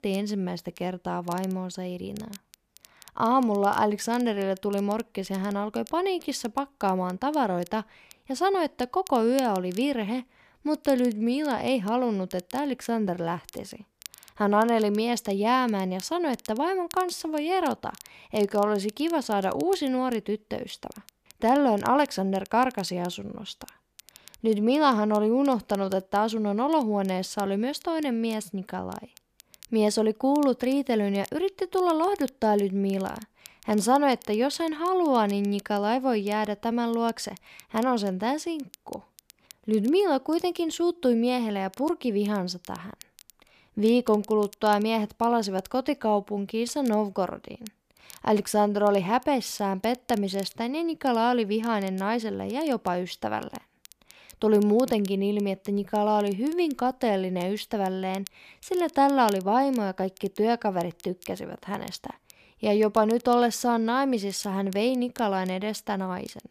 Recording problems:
crackle, like an old record; faint; 25 dB below the speech

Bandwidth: 14.5 kHz